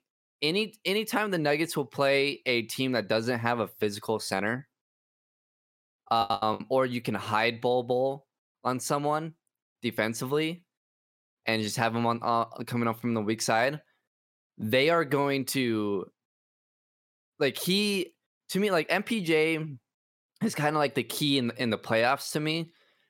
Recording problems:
choppy; very; at 6 s; 41% of the speech affected

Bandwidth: 16.5 kHz